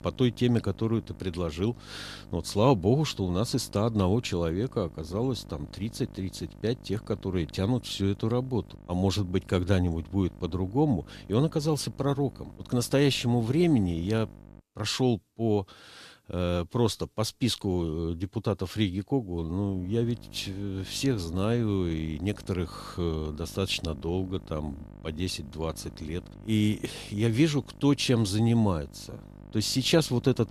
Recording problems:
electrical hum; faint; until 15 s and from 20 s on; 50 Hz, 25 dB below the speech

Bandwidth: 14.5 kHz